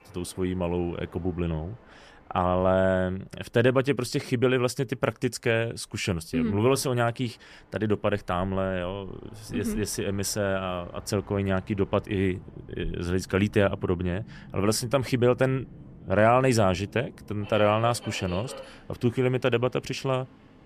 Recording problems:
train or aircraft noise; faint; throughout; 20 dB below the speech

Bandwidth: 14.5 kHz